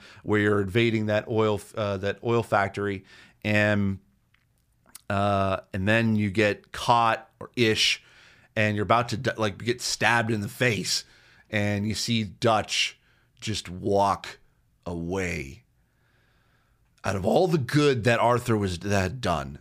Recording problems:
none

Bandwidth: 15 kHz